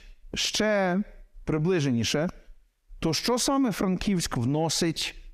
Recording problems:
squashed, flat; heavily

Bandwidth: 14.5 kHz